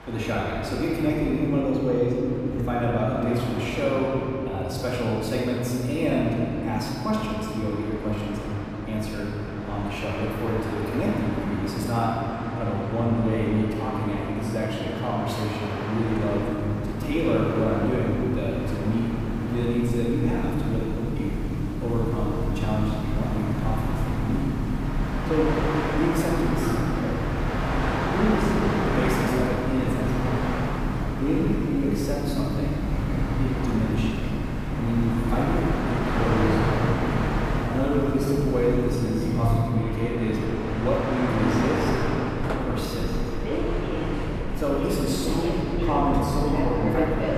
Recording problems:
room echo; strong; dies away in 3 s
off-mic speech; far
train or aircraft noise; loud; throughout; 3 dB below the speech
background chatter; very faint; throughout; 3 voices, 30 dB below the speech

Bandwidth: 15 kHz